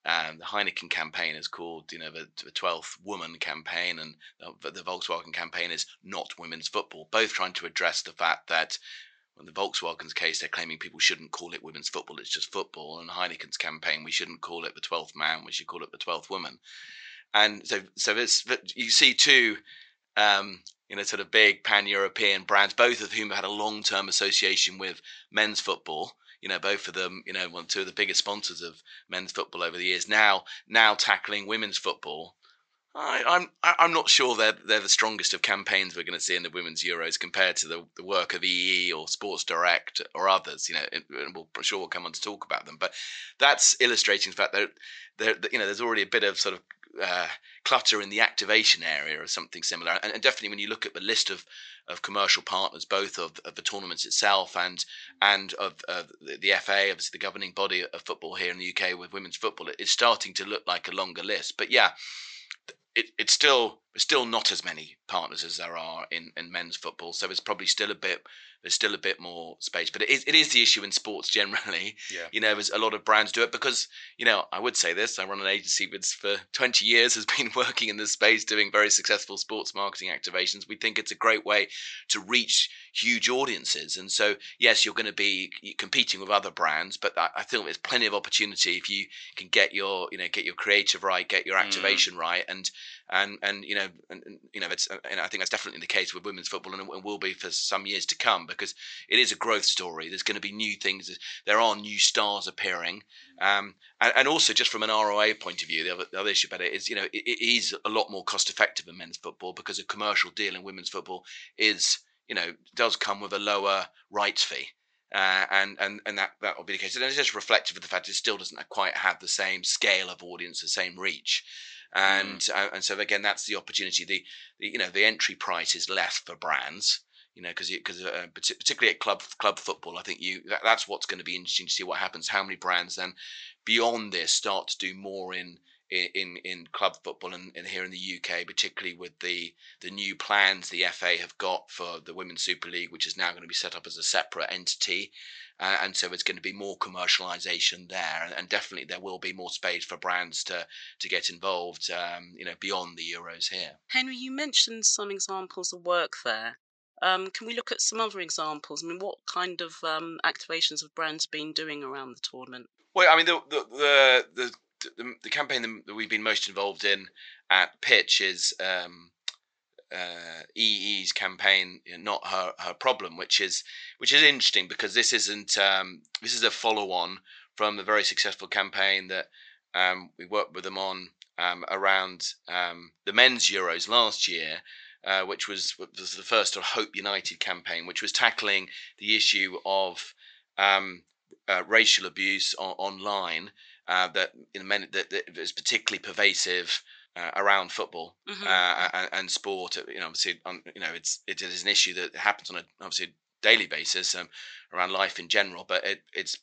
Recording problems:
thin; very; fading below 850 Hz
high frequencies cut off; noticeable; nothing above 8 kHz
uneven, jittery; strongly; from 50 s to 2:29

